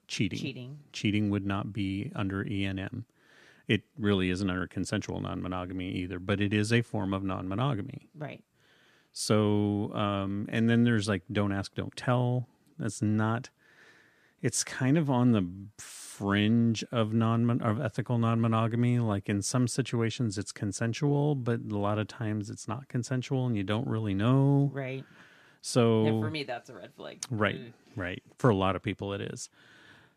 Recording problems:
none

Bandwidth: 14.5 kHz